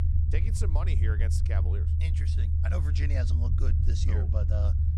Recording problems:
low rumble; loud; throughout; 2 dB below the speech

